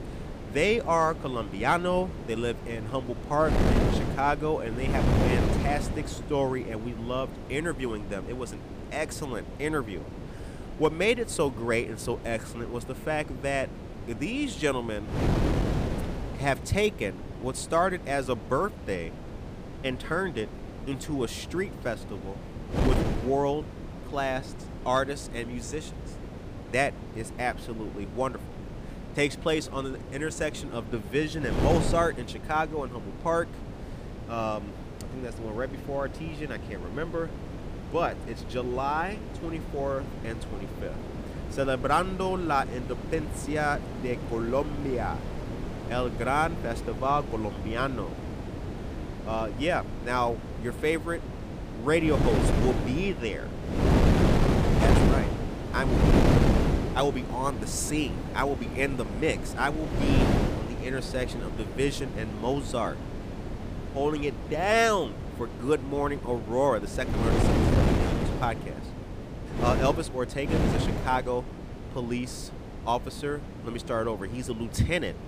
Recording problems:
wind noise on the microphone; heavy; 7 dB below the speech

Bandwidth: 15 kHz